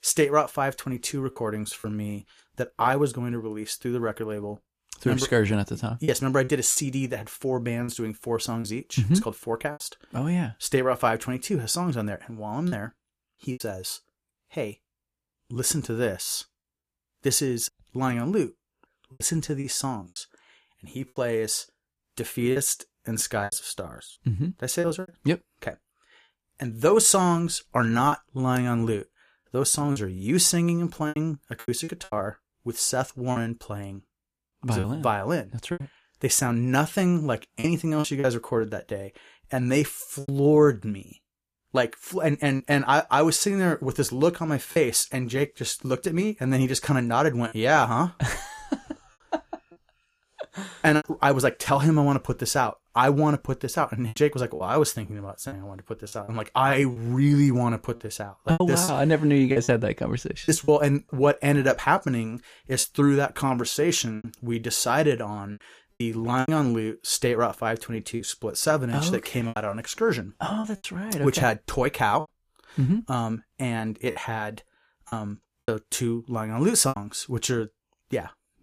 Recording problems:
choppy; very; 5% of the speech affected

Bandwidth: 14.5 kHz